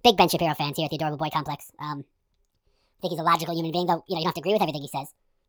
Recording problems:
wrong speed and pitch; too fast and too high; 1.5 times normal speed

